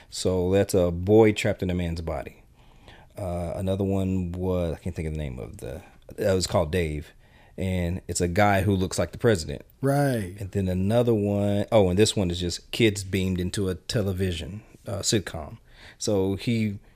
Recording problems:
none

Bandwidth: 15 kHz